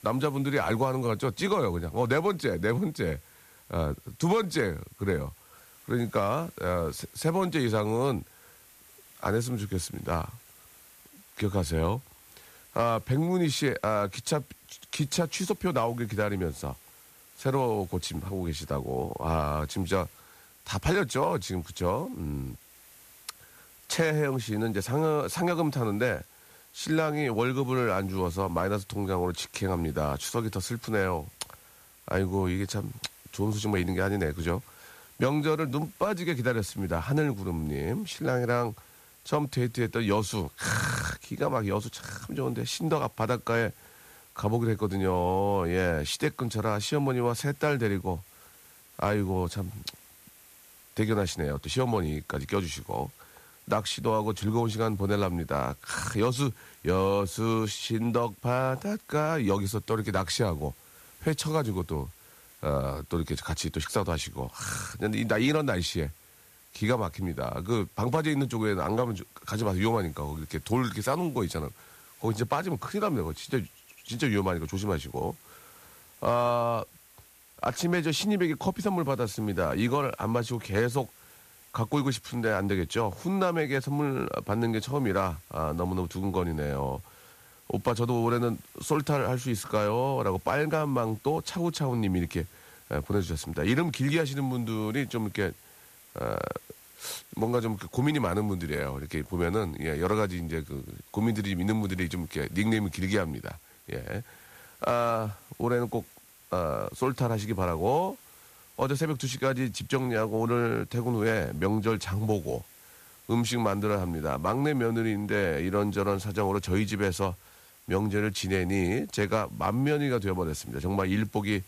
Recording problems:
hiss; faint; throughout; 25 dB below the speech

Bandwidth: 14.5 kHz